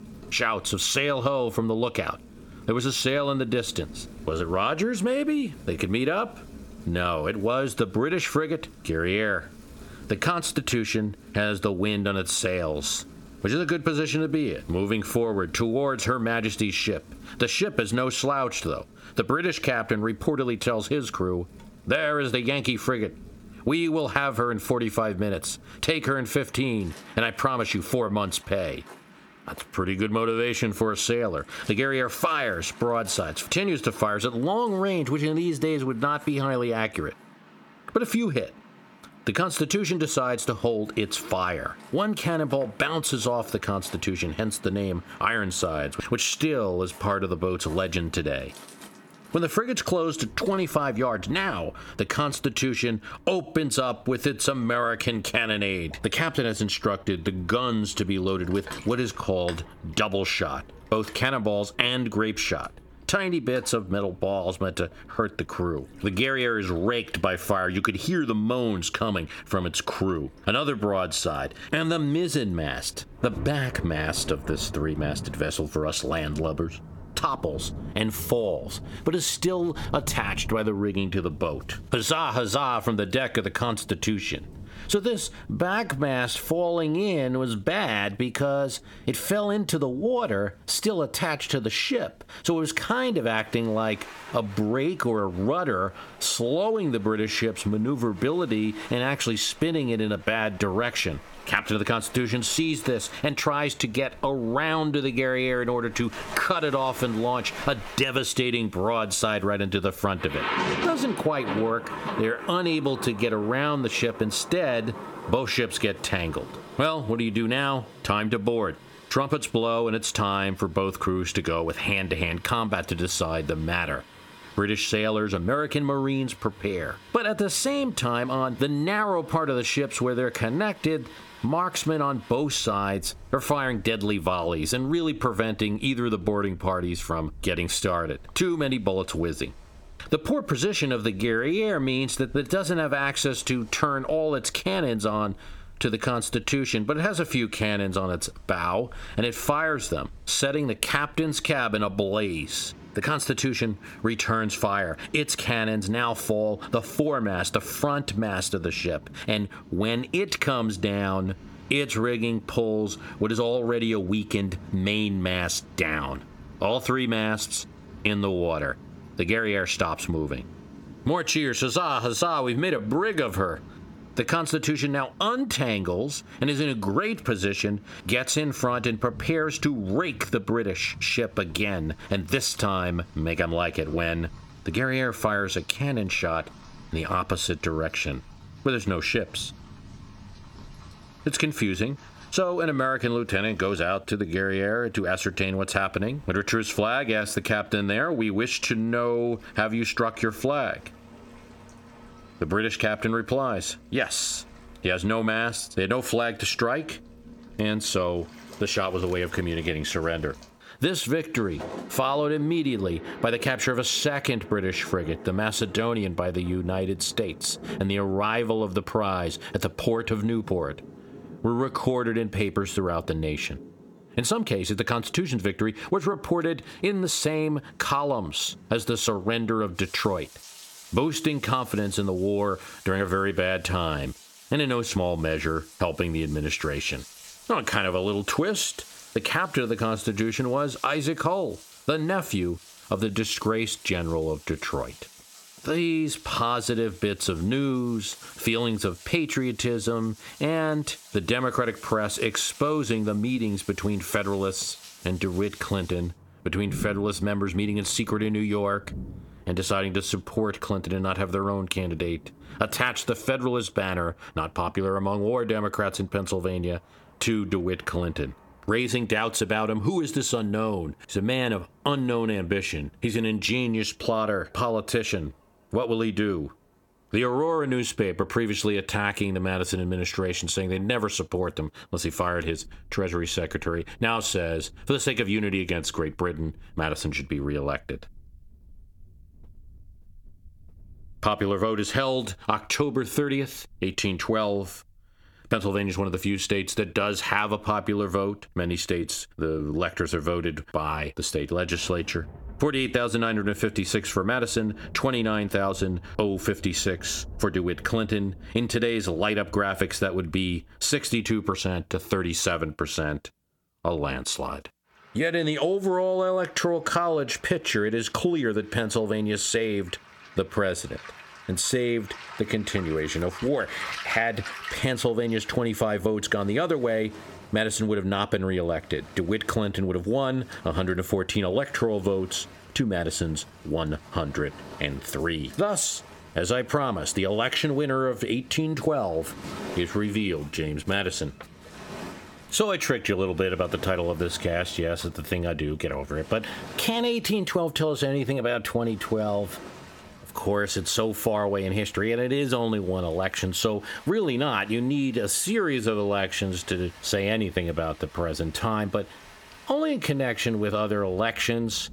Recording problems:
squashed, flat; somewhat, background pumping
rain or running water; noticeable; throughout; 20 dB below the speech

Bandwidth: 18 kHz